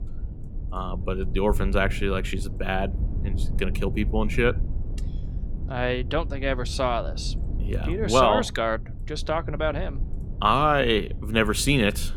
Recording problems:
low rumble; faint; throughout; 20 dB below the speech

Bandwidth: 17.5 kHz